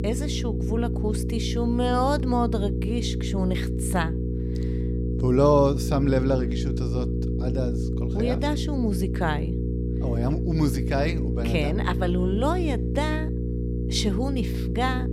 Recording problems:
electrical hum; loud; throughout; 60 Hz, 8 dB below the speech

